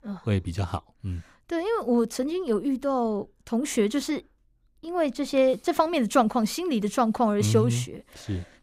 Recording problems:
none

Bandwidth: 15.5 kHz